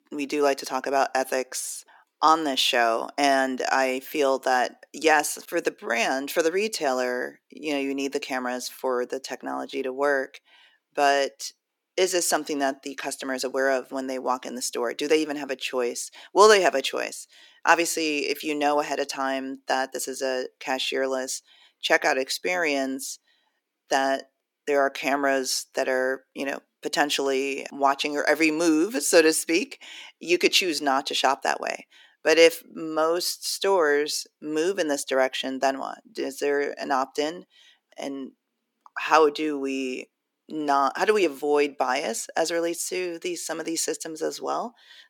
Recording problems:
thin; somewhat; fading below 300 Hz

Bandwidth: 17.5 kHz